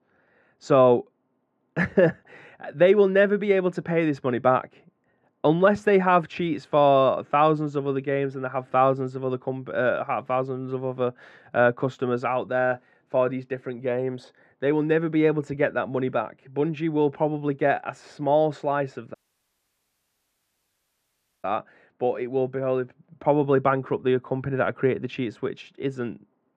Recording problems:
muffled; very; fading above 1.5 kHz
audio cutting out; at 19 s for 2.5 s

